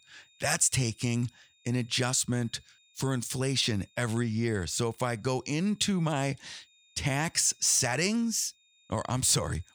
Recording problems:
high-pitched whine; faint; throughout; 3.5 kHz, 35 dB below the speech

